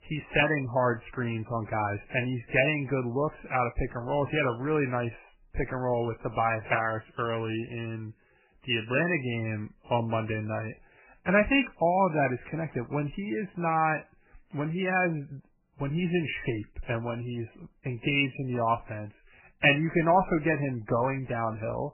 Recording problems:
garbled, watery; badly; nothing above 3 kHz

